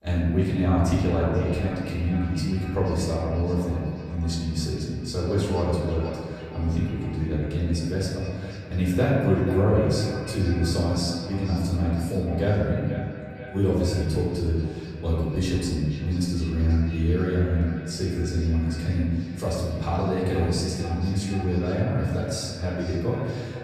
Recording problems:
off-mic speech; far
echo of what is said; noticeable; throughout; 480 ms later, 15 dB below the speech
room echo; noticeable; dies away in 1.5 s

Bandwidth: 14.5 kHz